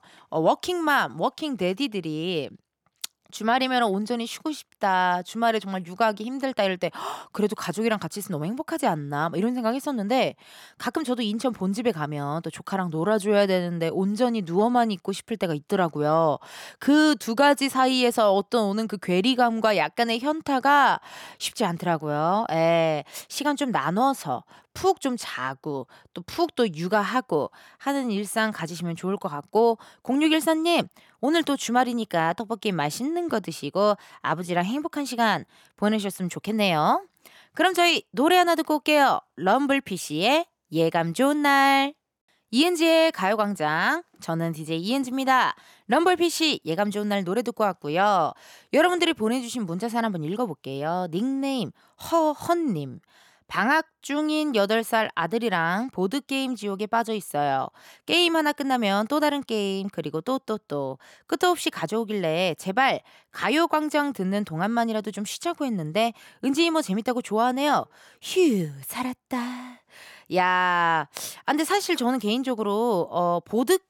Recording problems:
none

